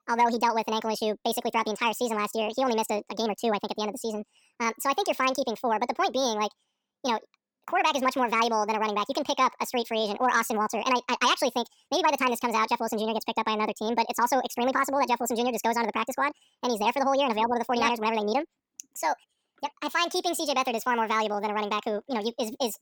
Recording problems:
wrong speed and pitch; too fast and too high; 1.7 times normal speed

